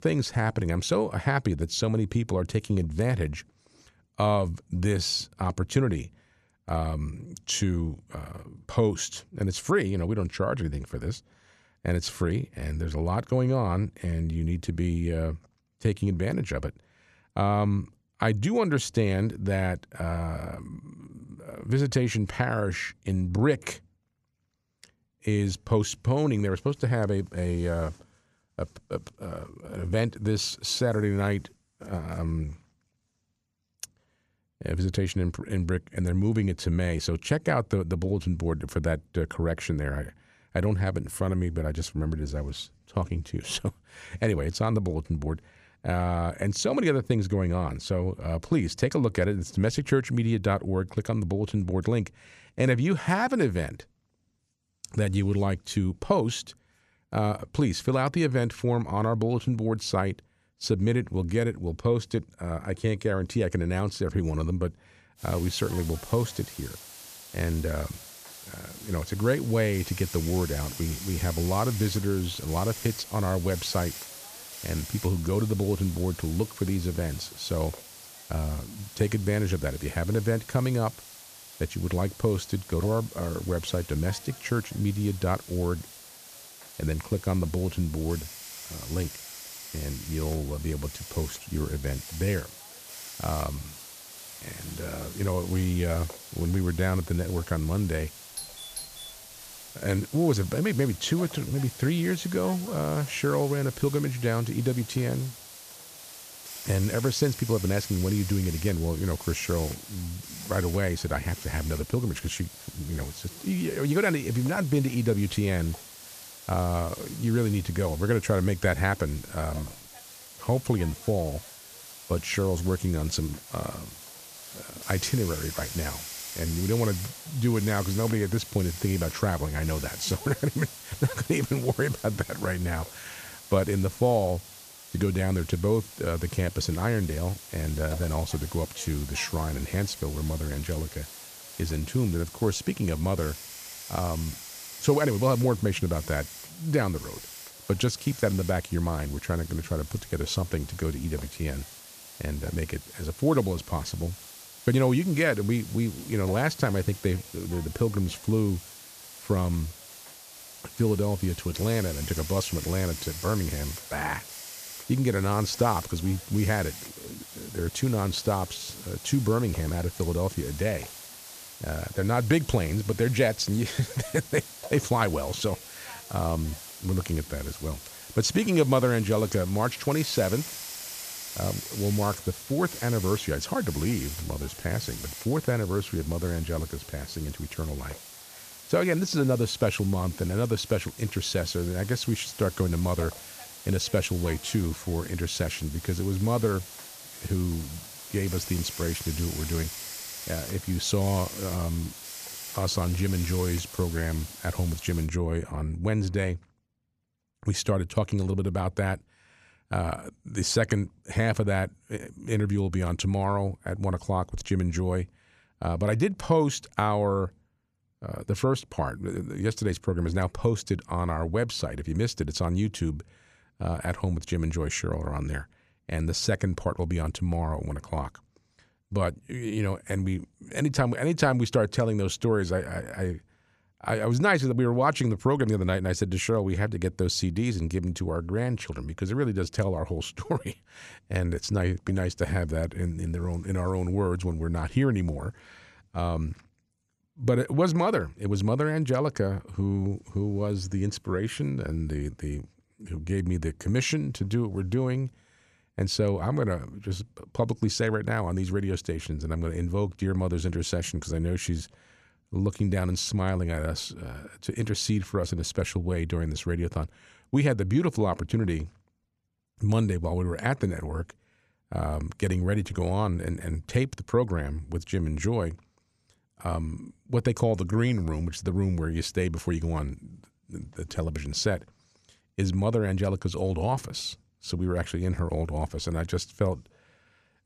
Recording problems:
hiss; noticeable; from 1:05 to 3:25; 10 dB below the speech
doorbell; noticeable; at 1:38; peak 9 dB below the speech

